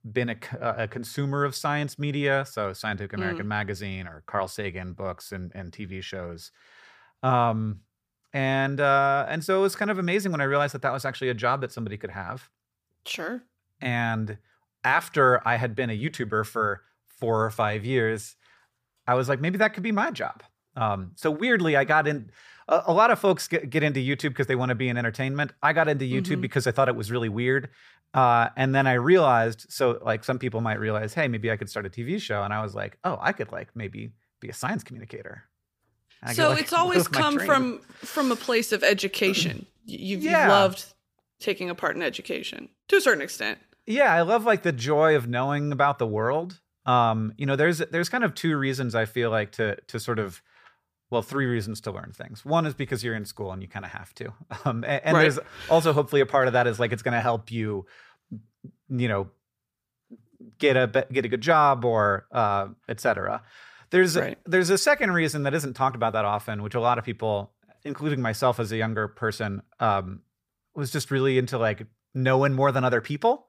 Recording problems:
none

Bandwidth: 15 kHz